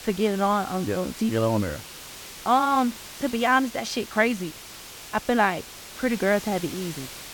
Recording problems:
hiss; noticeable; throughout; 15 dB below the speech

